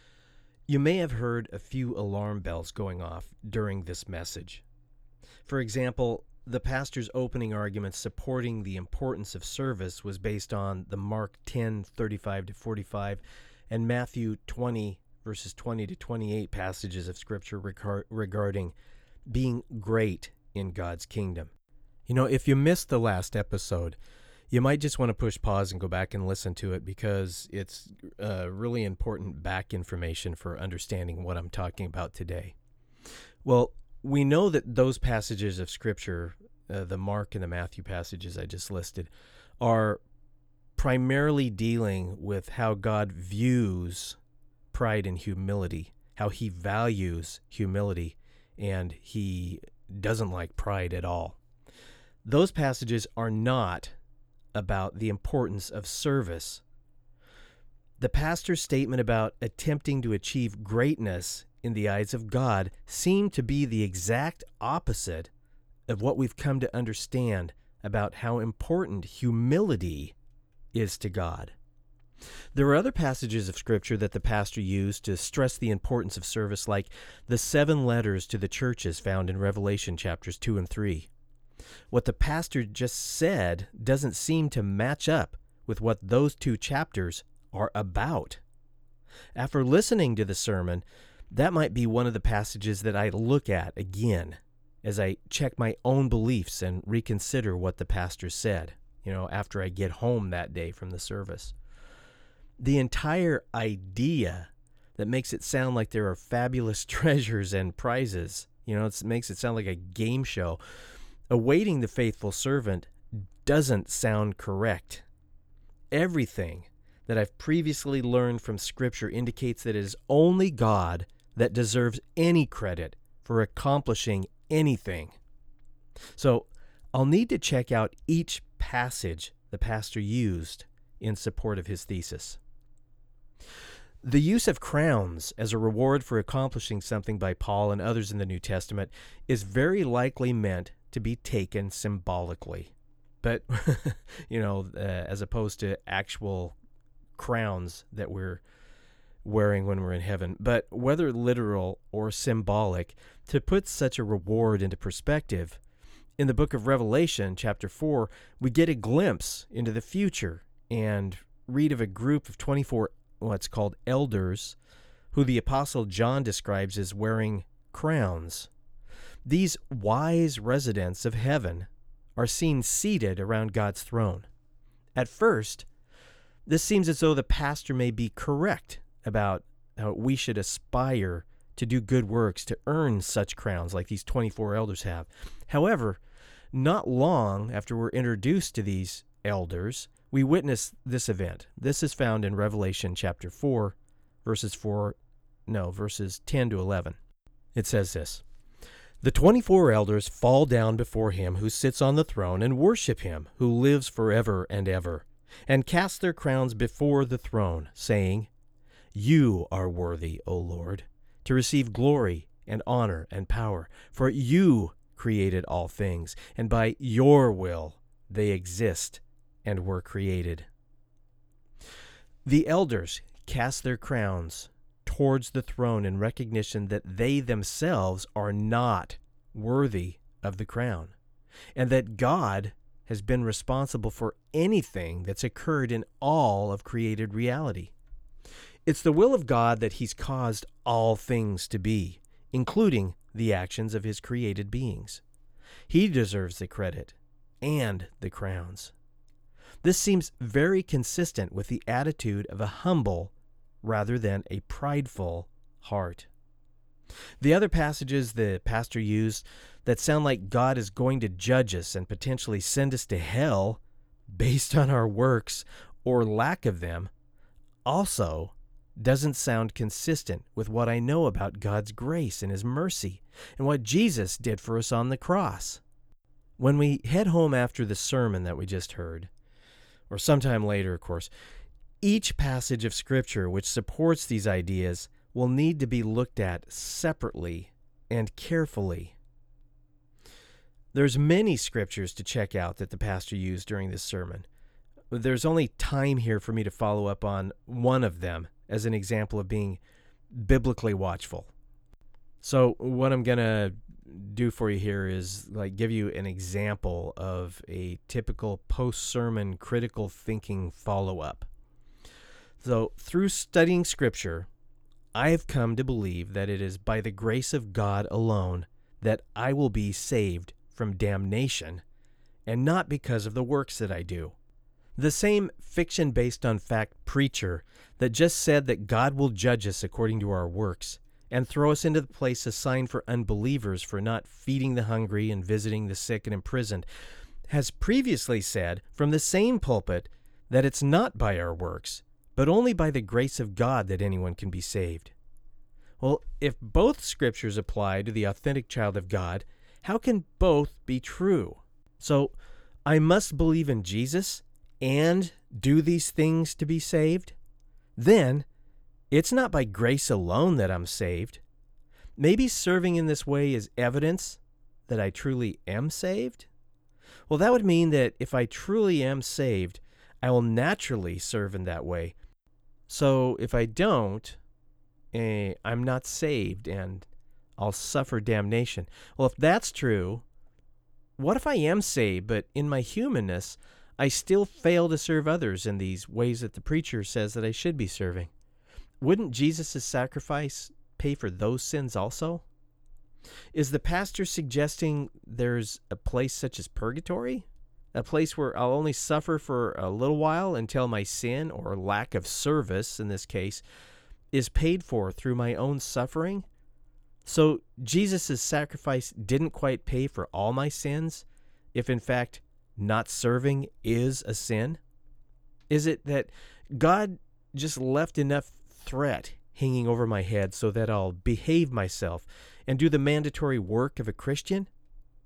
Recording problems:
none

